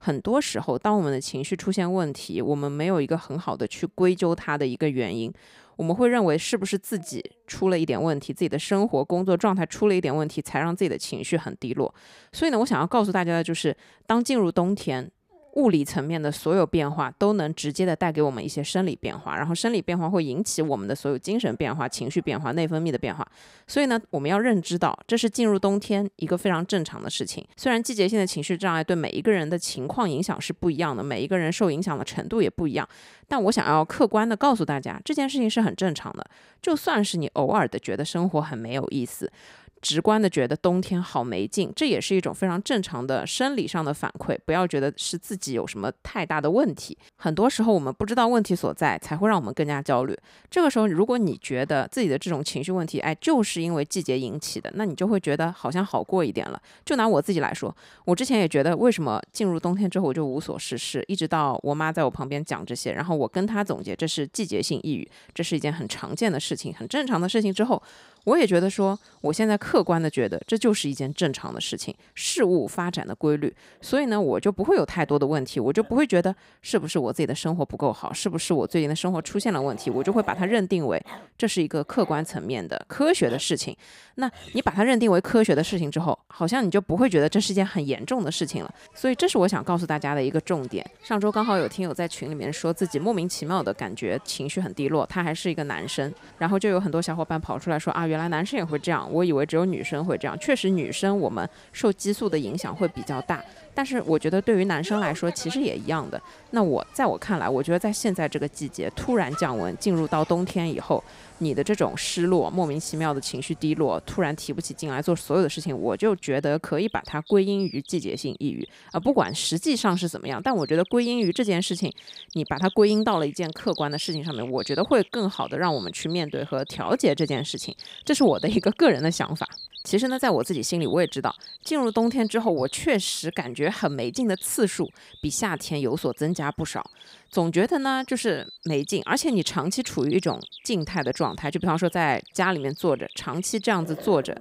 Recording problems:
animal sounds; noticeable; throughout; 20 dB below the speech

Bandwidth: 15.5 kHz